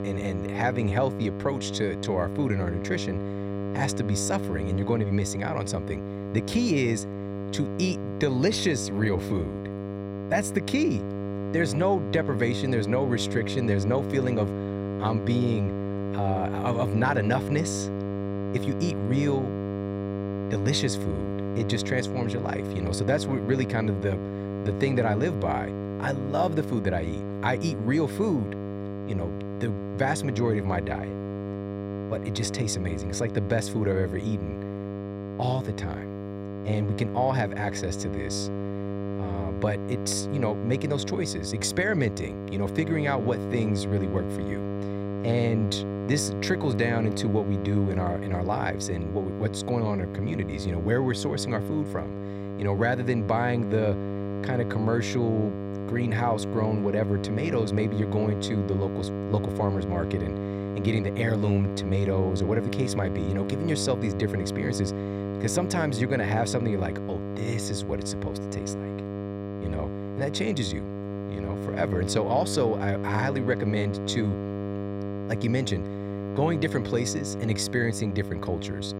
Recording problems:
electrical hum; loud; throughout; 50 Hz, 6 dB below the speech

